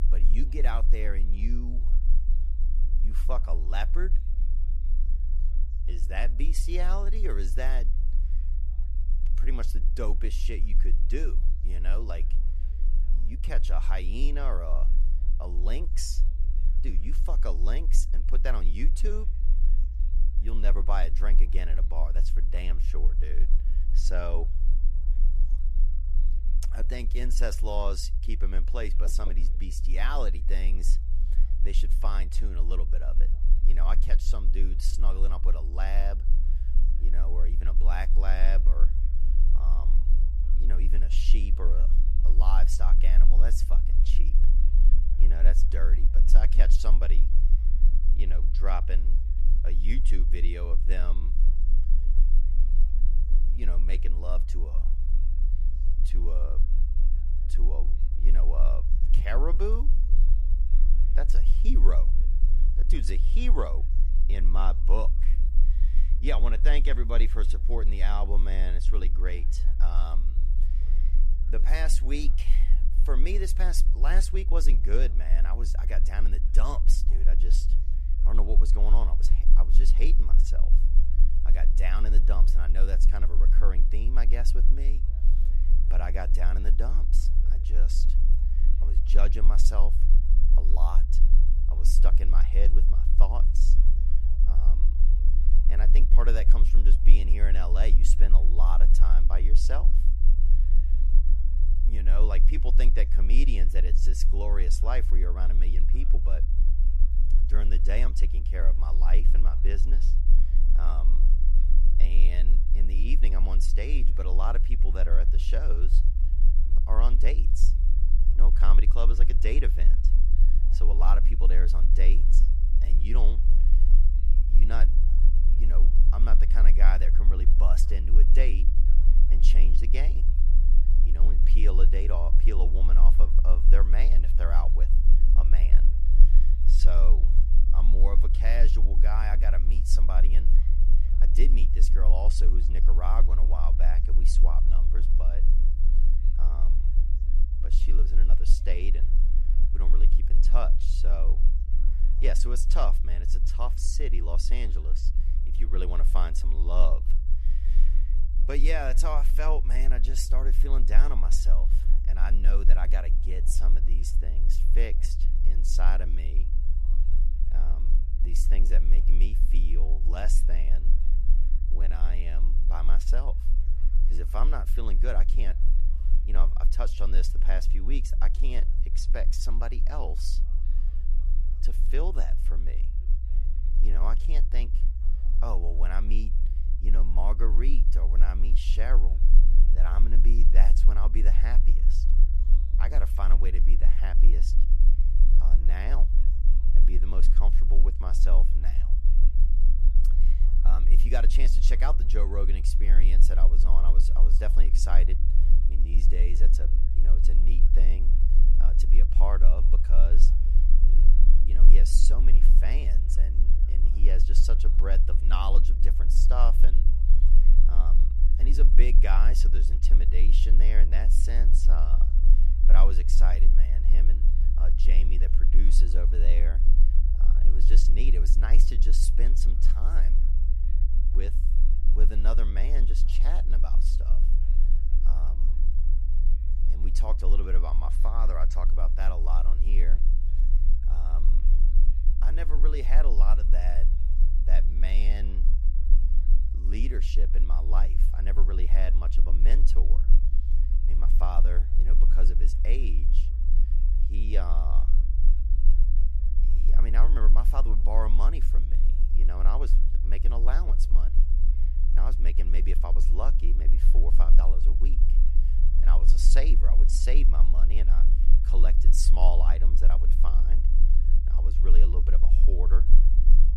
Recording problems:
low rumble; noticeable; throughout; 10 dB below the speech
background chatter; faint; throughout; 4 voices, 25 dB below the speech

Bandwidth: 14 kHz